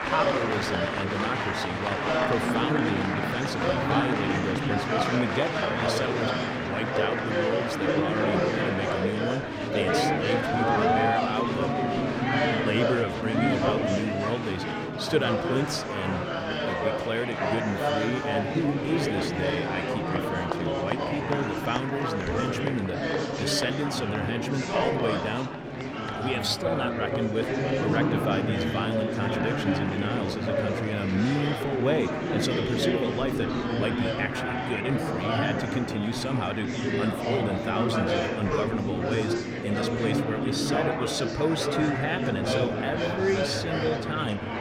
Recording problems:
murmuring crowd; very loud; throughout; 3 dB above the speech

